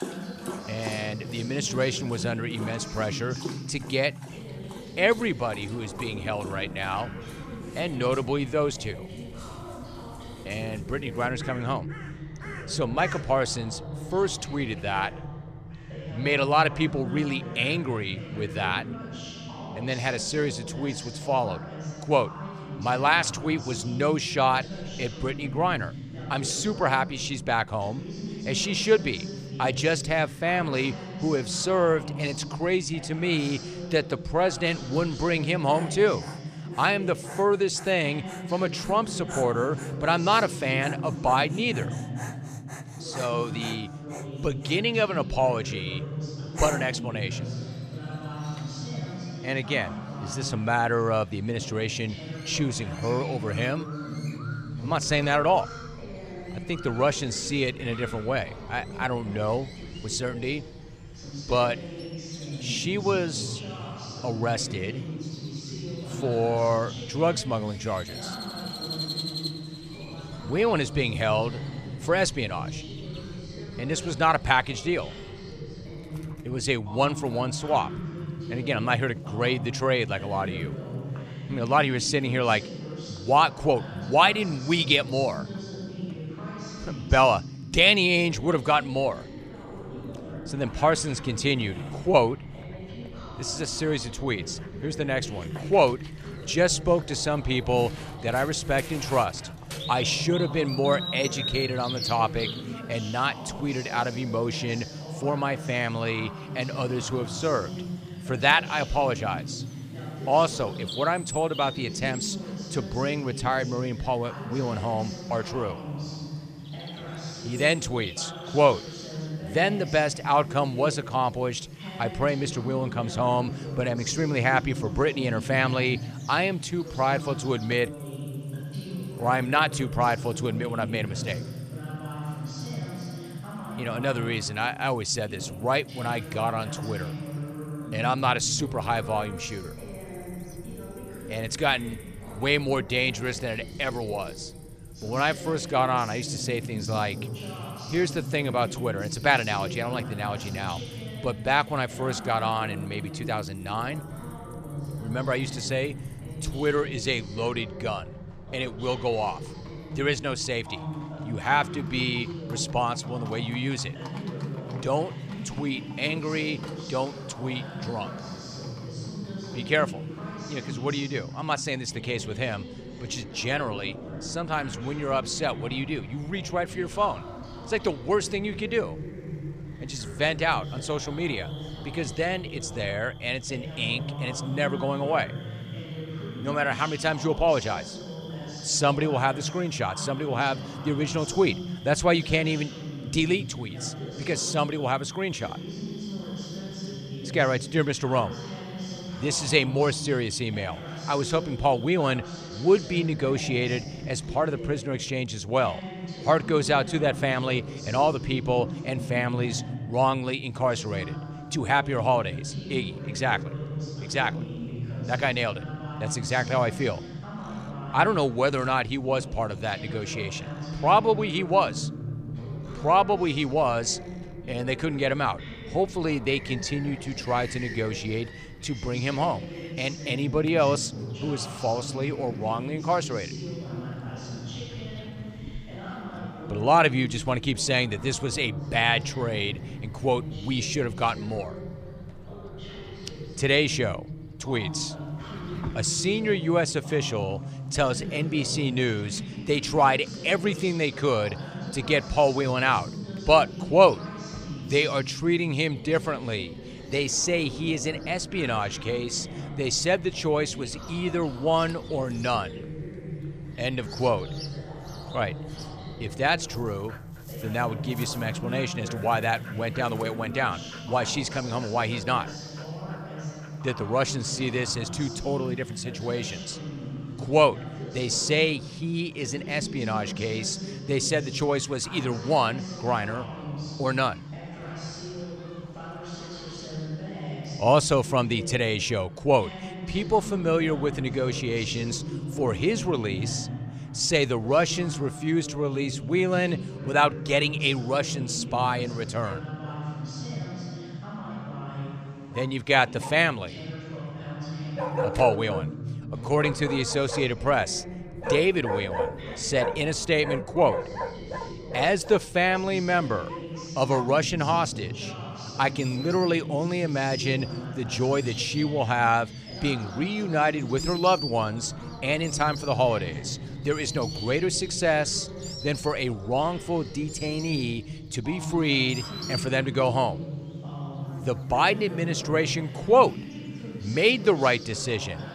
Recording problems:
animal sounds; noticeable; throughout; 15 dB below the speech
voice in the background; noticeable; throughout; 10 dB below the speech

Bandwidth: 14.5 kHz